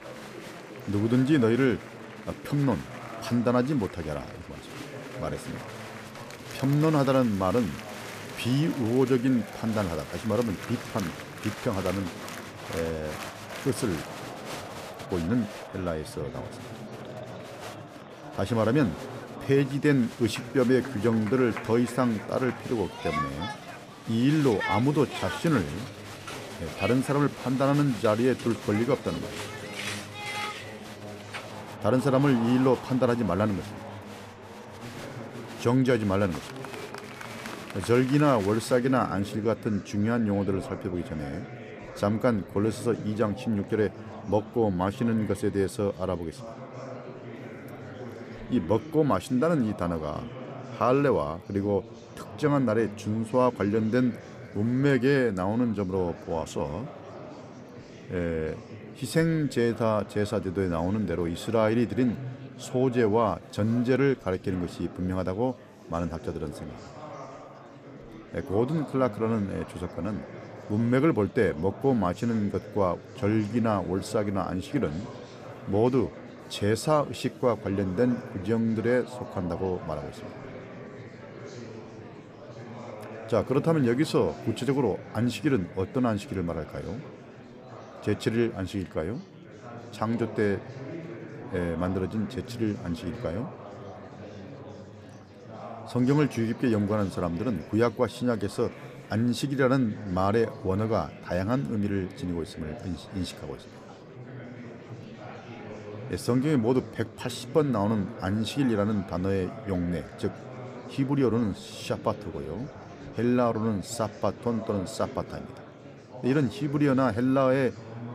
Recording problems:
murmuring crowd; noticeable; throughout; 15 dB below the speech

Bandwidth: 14.5 kHz